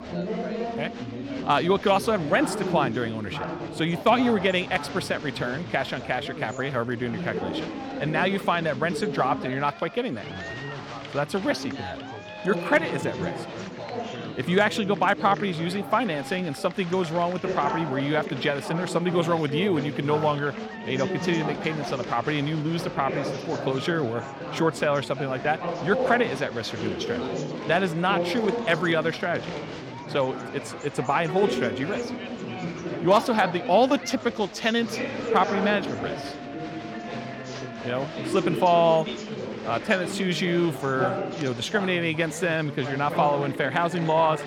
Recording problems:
chatter from many people; loud; throughout; 7 dB below the speech

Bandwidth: 17 kHz